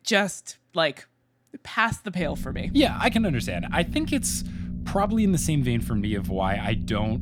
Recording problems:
low rumble; noticeable; from 2 s on; 15 dB below the speech

